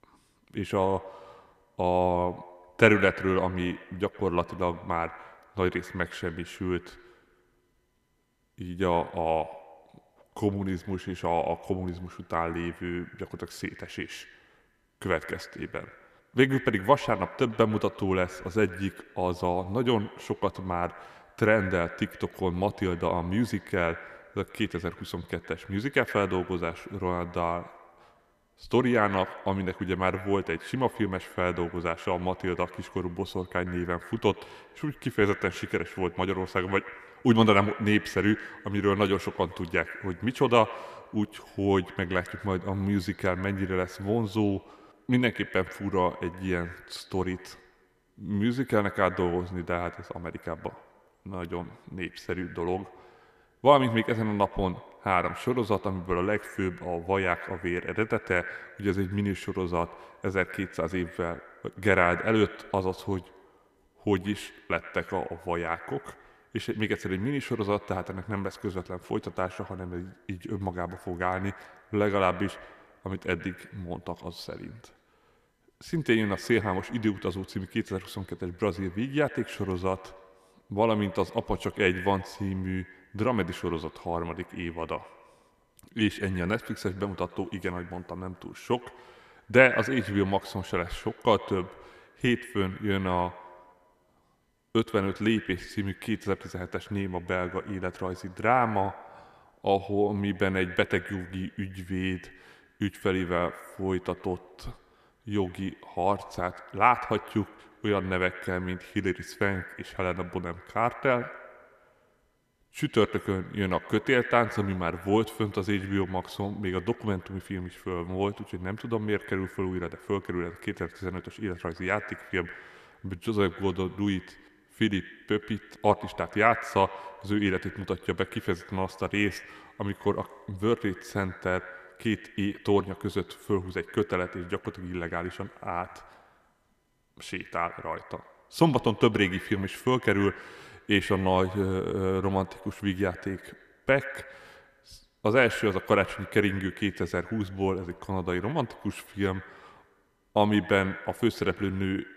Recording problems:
echo of what is said; noticeable; throughout; 110 ms later, 15 dB below the speech

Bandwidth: 14.5 kHz